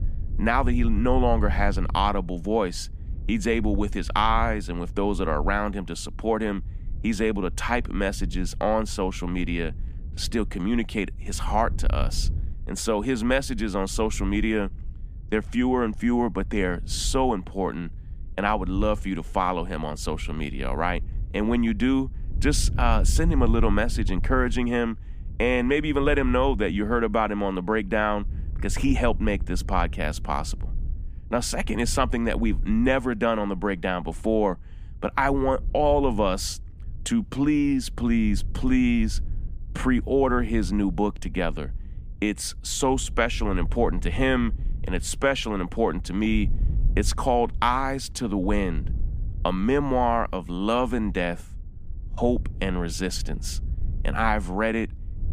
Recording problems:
wind noise on the microphone; occasional gusts; 25 dB below the speech

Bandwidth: 15 kHz